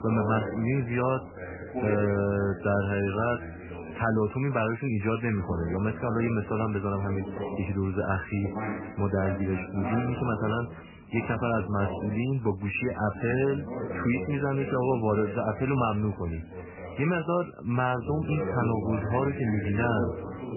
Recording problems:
garbled, watery; badly; nothing above 3 kHz
voice in the background; loud; throughout; 8 dB below the speech

